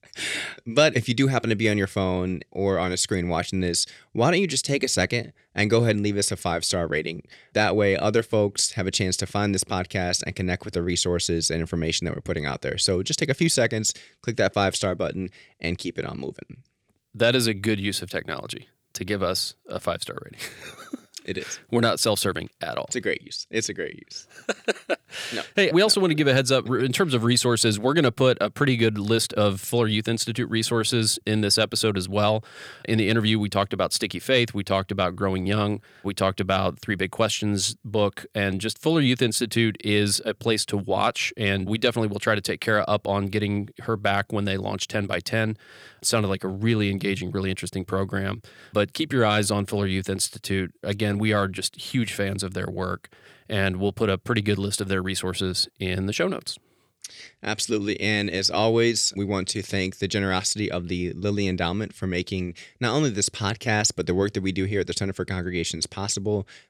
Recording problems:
none

